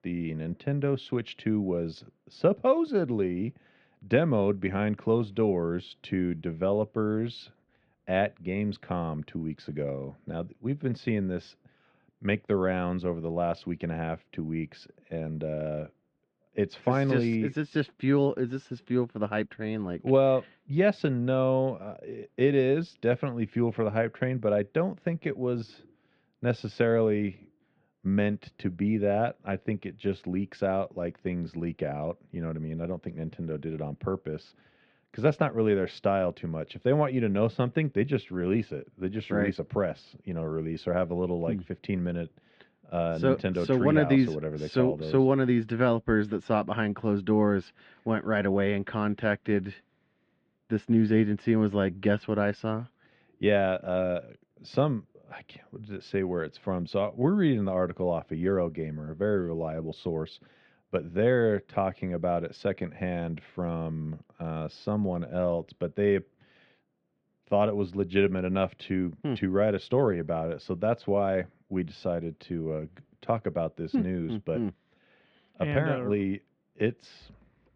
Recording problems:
muffled; very; fading above 3.5 kHz

